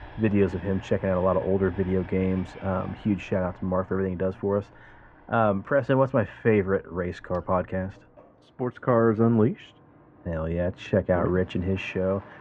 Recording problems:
muffled; very; fading above 1.5 kHz
train or aircraft noise; faint; throughout; 25 dB below the speech

